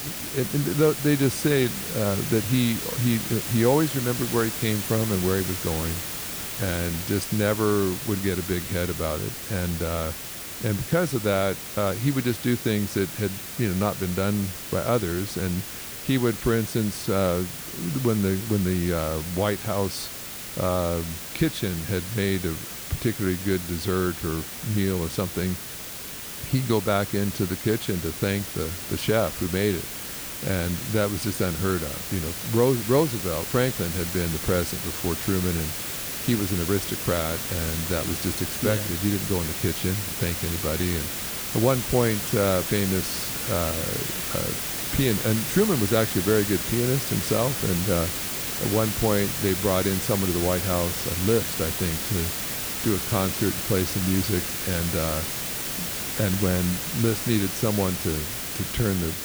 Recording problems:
hiss; loud; throughout; 3 dB below the speech

